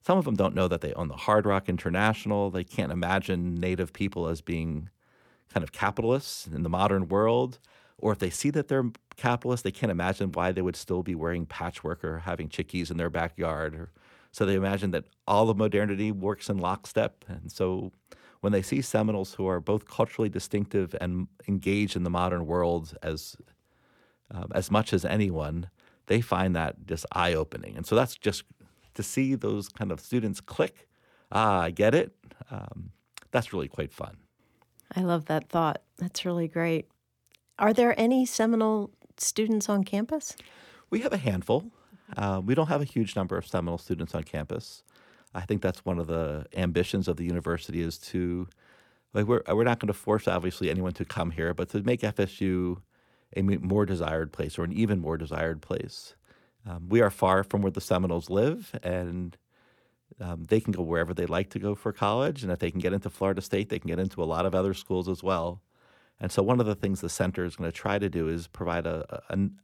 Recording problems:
none

